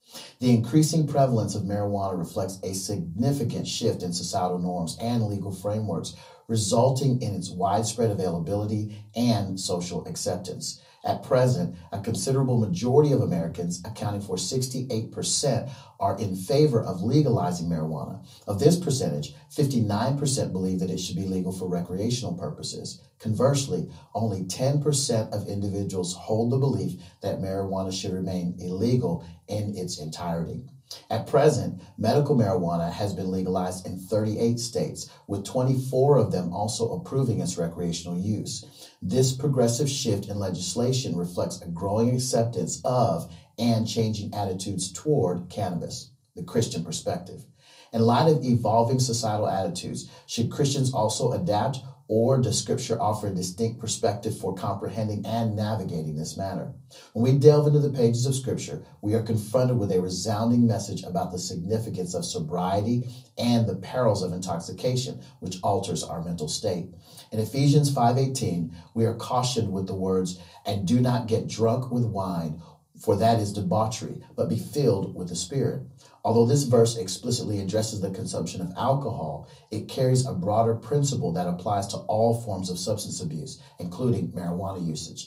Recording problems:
off-mic speech; far
room echo; very slight; dies away in 0.2 s

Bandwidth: 15.5 kHz